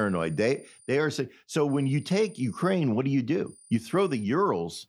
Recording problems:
high-pitched whine; faint; at the start, from 1.5 to 2.5 s and at 3.5 s; 9.5 kHz, 25 dB below the speech
abrupt cut into speech; at the start

